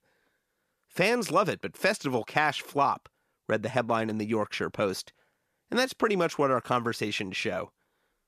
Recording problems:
none

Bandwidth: 14.5 kHz